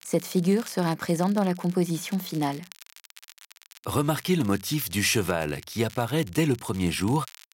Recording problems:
crackle, like an old record; faint; 20 dB below the speech

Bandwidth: 16 kHz